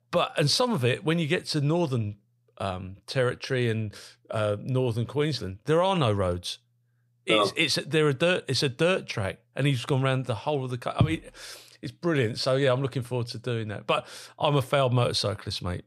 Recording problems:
none

